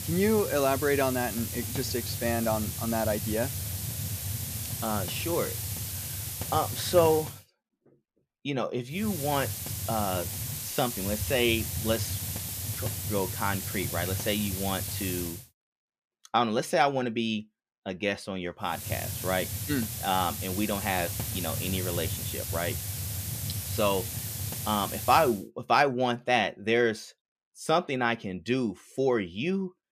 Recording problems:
hiss; loud; until 7.5 s, from 9 to 15 s and from 19 to 25 s; 4 dB below the speech

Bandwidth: 14.5 kHz